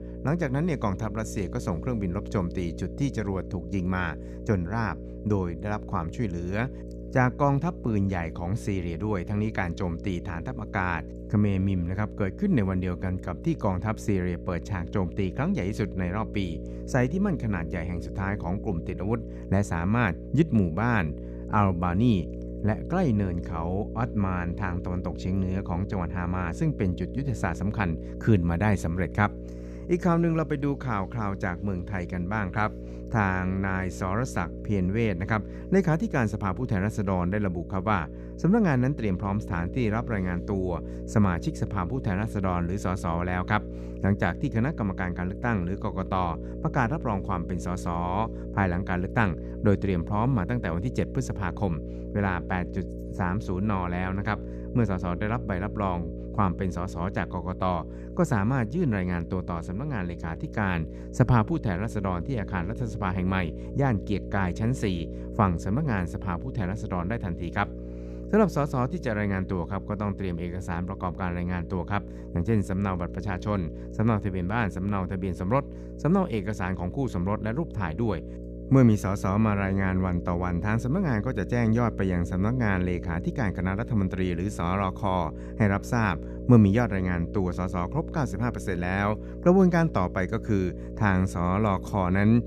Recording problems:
electrical hum; noticeable; throughout; 60 Hz, 15 dB below the speech

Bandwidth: 14 kHz